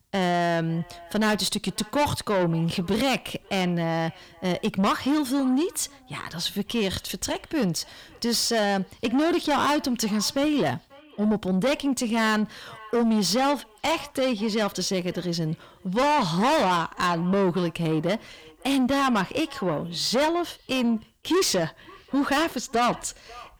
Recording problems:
distortion; heavy; 7 dB below the speech
echo of what is said; faint; throughout; 540 ms later, 25 dB below the speech

